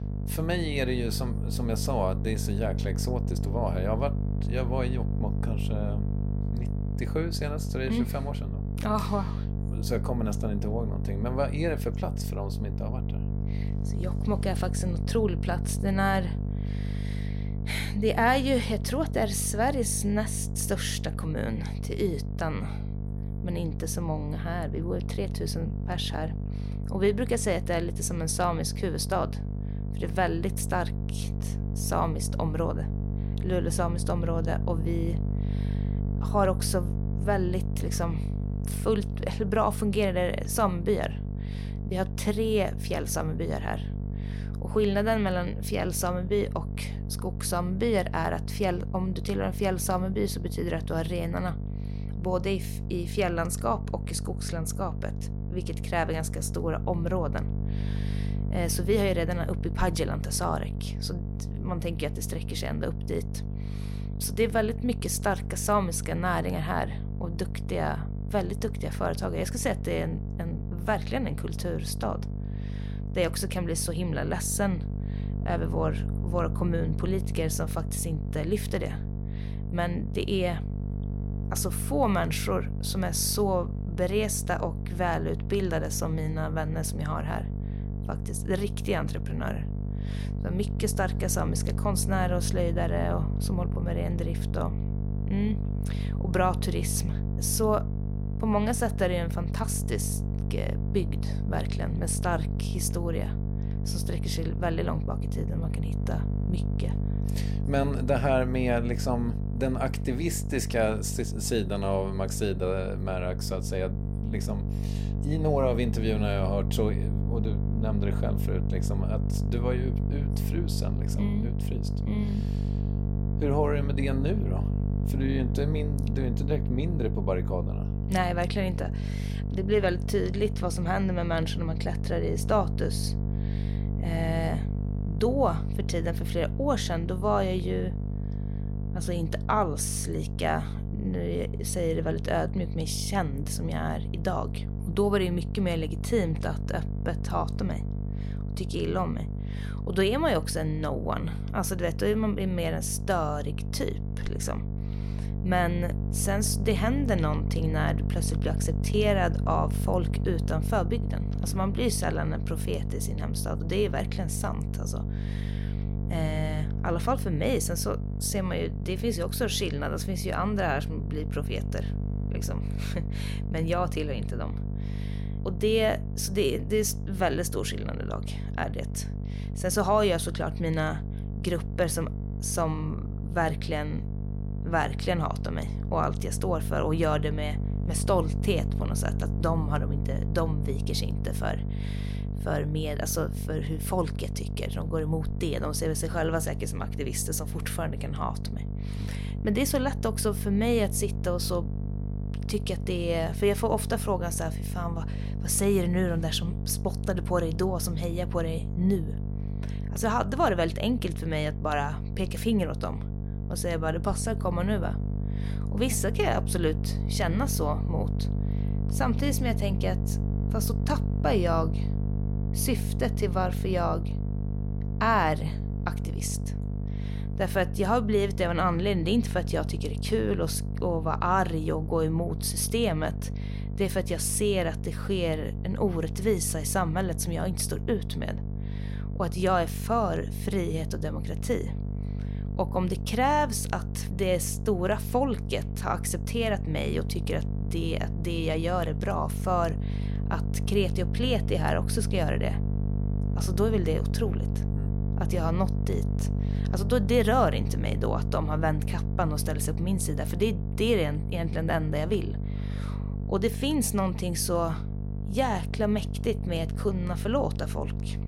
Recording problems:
electrical hum; noticeable; throughout; 50 Hz, 10 dB below the speech

